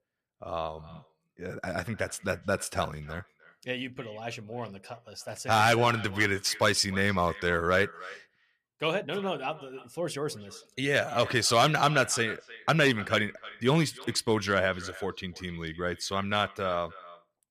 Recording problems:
echo of what is said; noticeable; throughout; 300 ms later, 20 dB below the speech

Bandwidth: 14.5 kHz